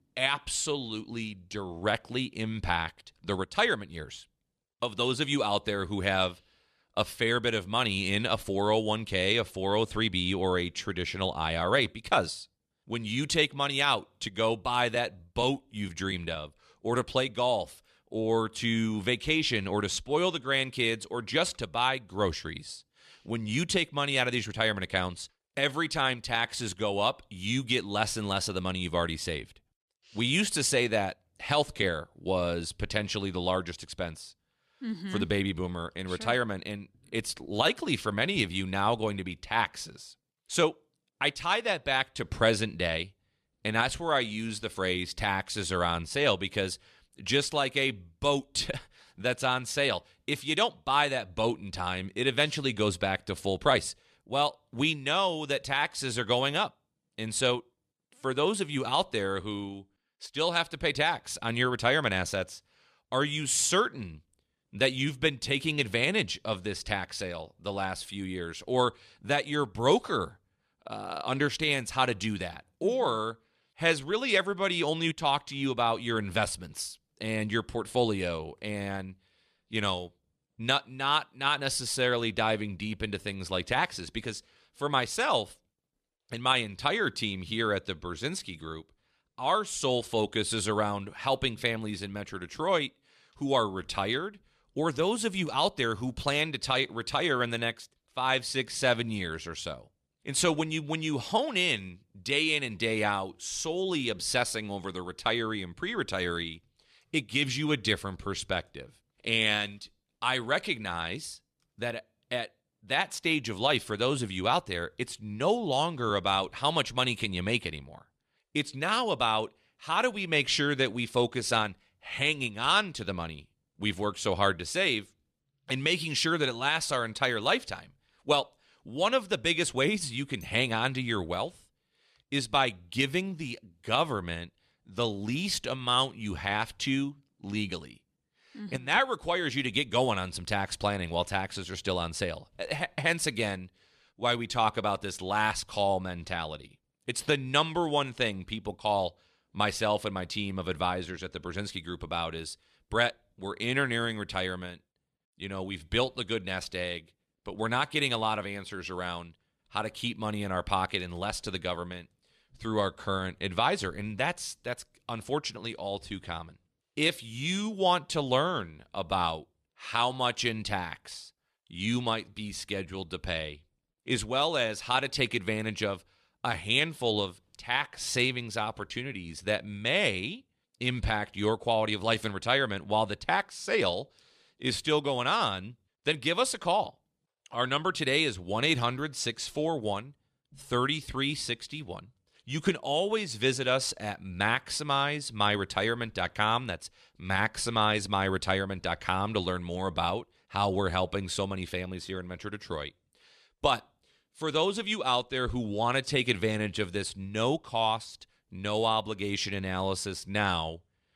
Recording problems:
none

